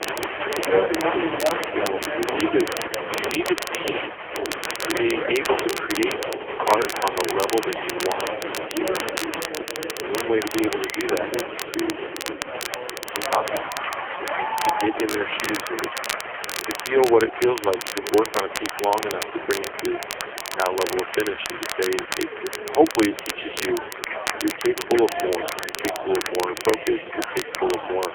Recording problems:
phone-call audio; poor line; nothing above 3.5 kHz
crowd noise; loud; throughout; 4 dB below the speech
crackle, like an old record; loud; 7 dB below the speech
chatter from many people; noticeable; throughout; 15 dB below the speech

